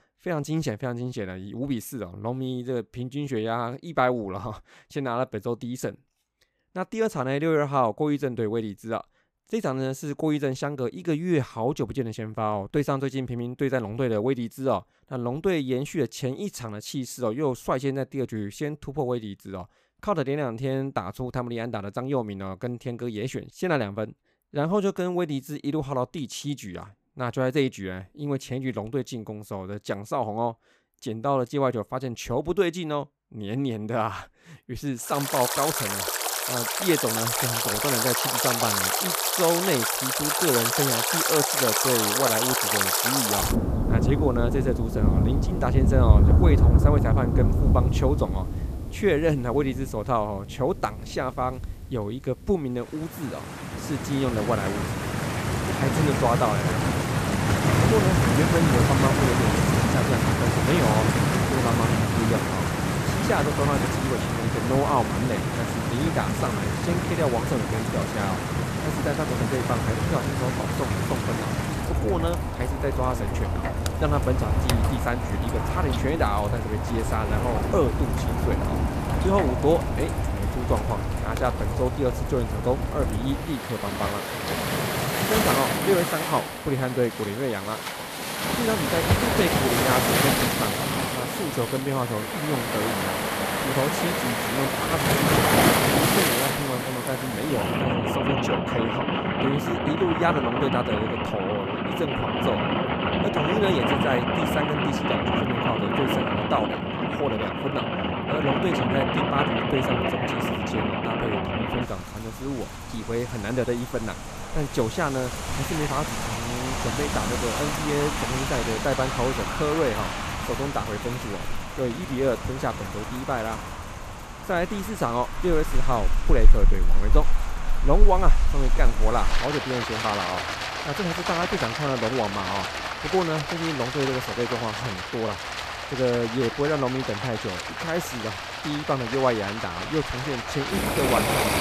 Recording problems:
rain or running water; very loud; from 35 s on; 3 dB above the speech

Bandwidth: 14.5 kHz